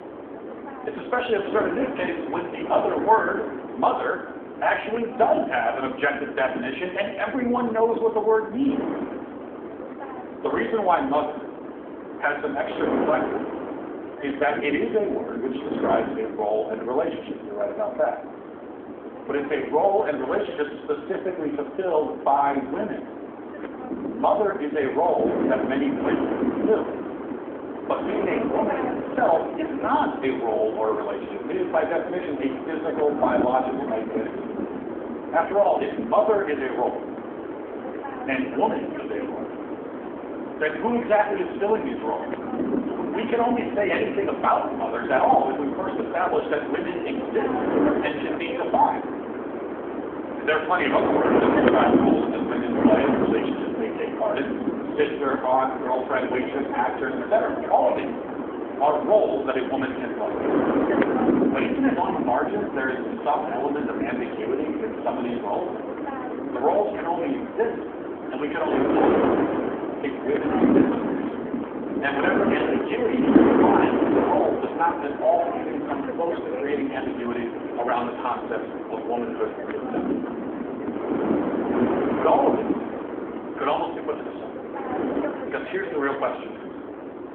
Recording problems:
room echo; slight; dies away in 0.7 s
phone-call audio
off-mic speech; somewhat distant
wind noise on the microphone; heavy; 5 dB below the speech

